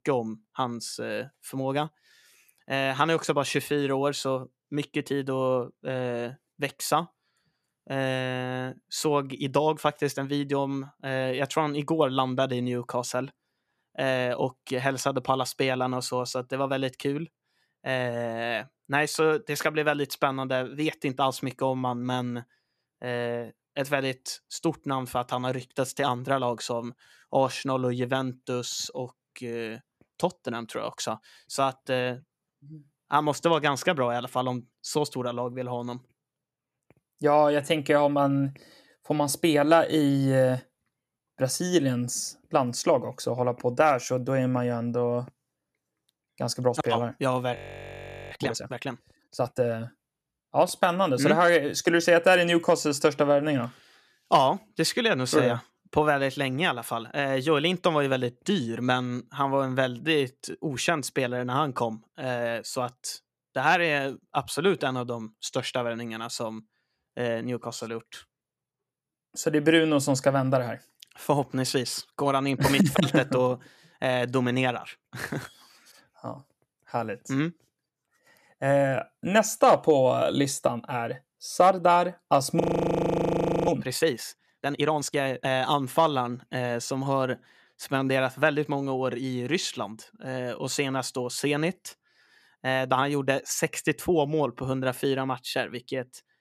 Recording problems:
audio freezing; at 48 s for 1 s and at 1:23 for 1 s

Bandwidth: 14.5 kHz